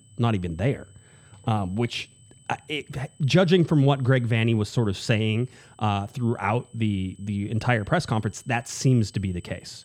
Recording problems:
high-pitched whine; faint; throughout; 8 kHz, 30 dB below the speech

